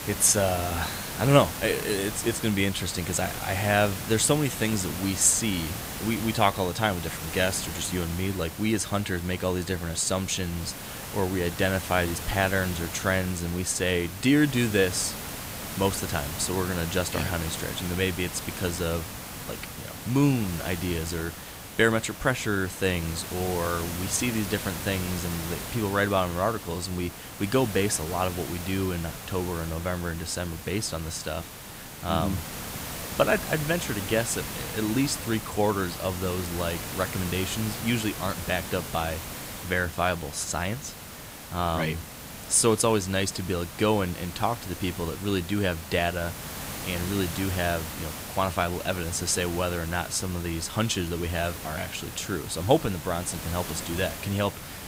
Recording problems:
hiss; loud; throughout; 8 dB below the speech

